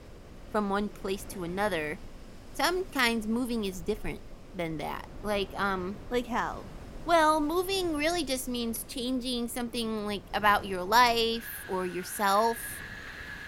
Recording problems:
wind in the background; noticeable; throughout; 15 dB below the speech

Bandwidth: 16 kHz